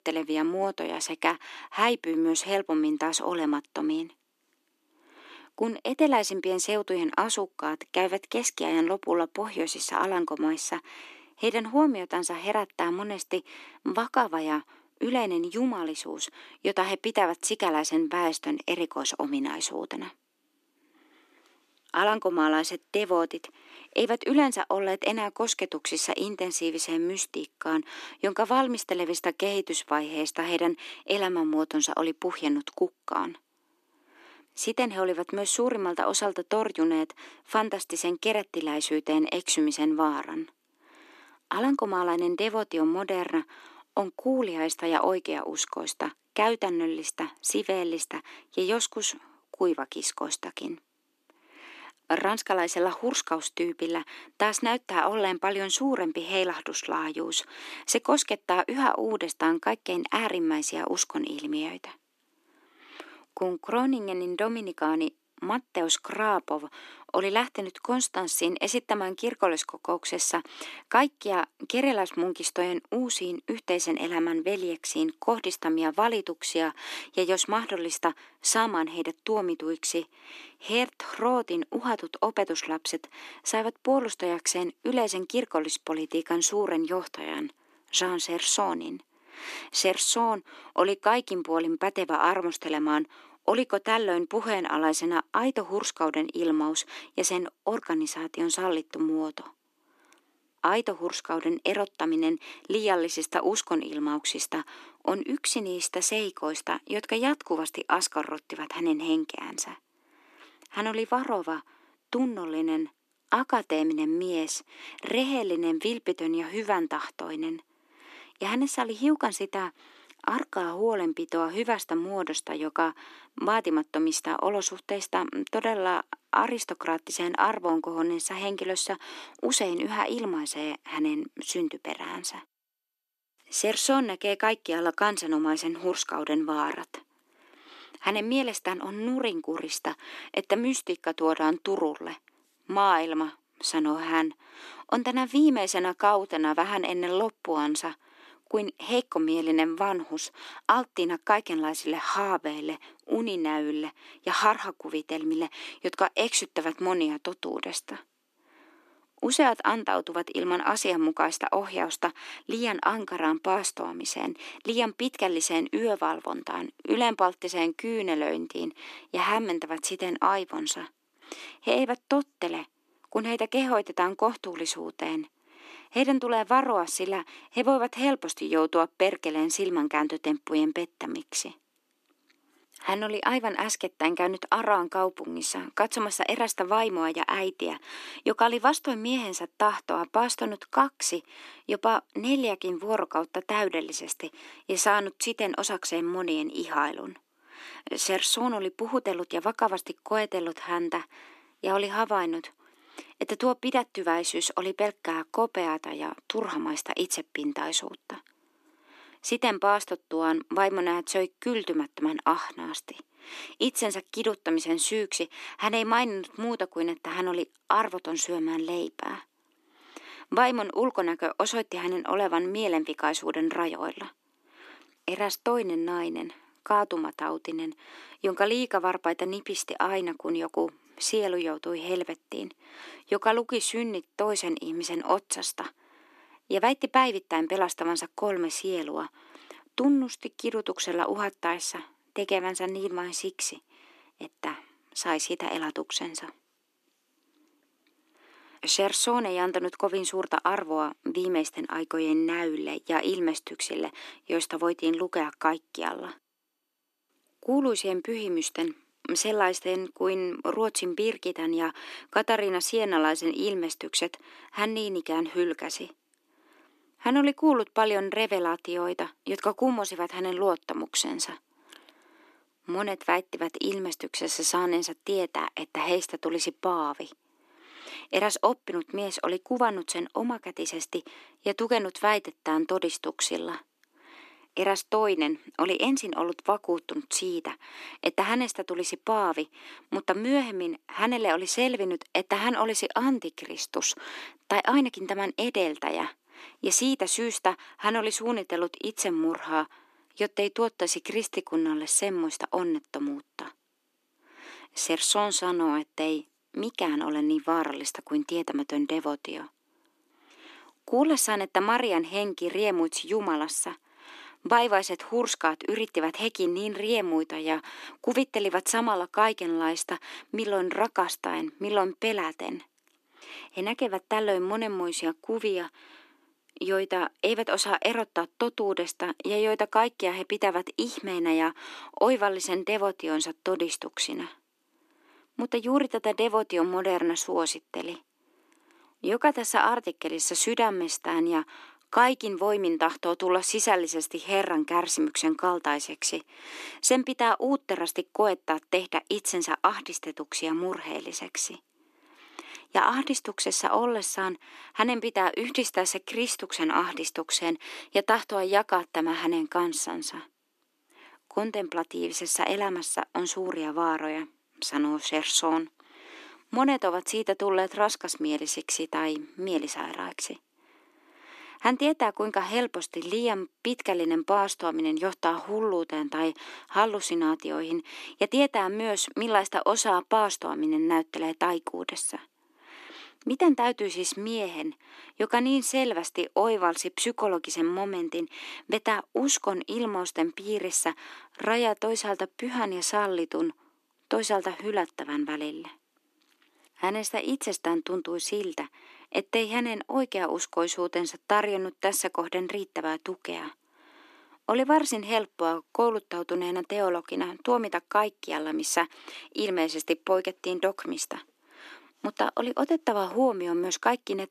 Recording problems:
thin; somewhat; fading below 300 Hz

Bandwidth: 13.5 kHz